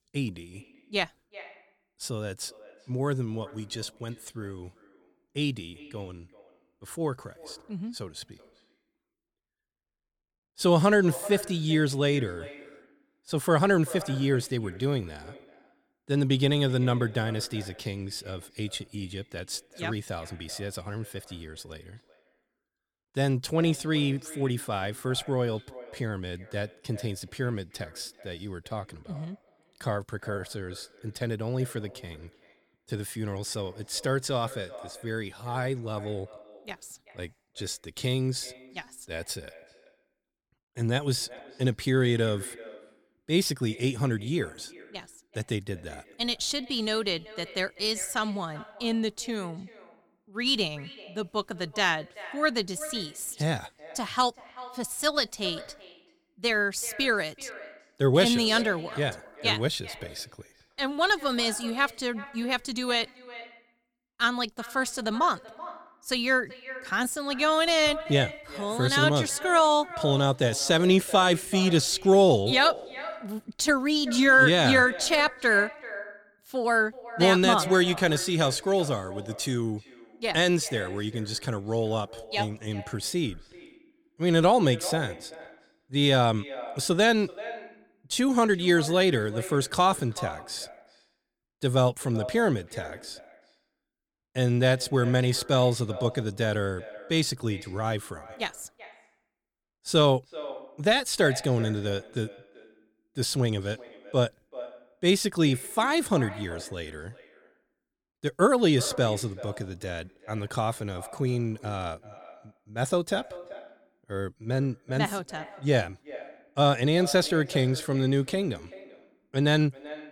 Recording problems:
echo of what is said; noticeable; throughout; 380 ms later, 15 dB below the speech

